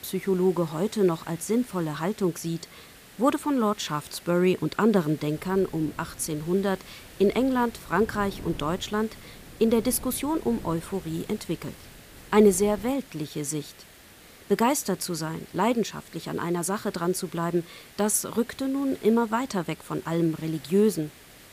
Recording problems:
wind noise on the microphone; occasional gusts; from 5.5 to 13 s; 25 dB below the speech
hiss; faint; throughout; 20 dB below the speech

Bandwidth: 15 kHz